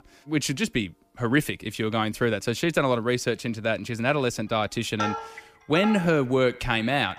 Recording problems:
echo of what is said; faint; from 5.5 s on; 90 ms later, 20 dB below the speech
background music; loud; throughout; 9 dB below the speech

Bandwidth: 15 kHz